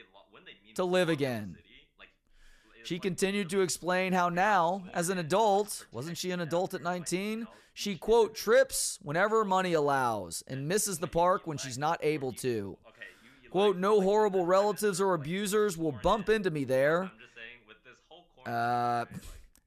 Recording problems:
voice in the background; faint; throughout; 25 dB below the speech

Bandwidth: 14 kHz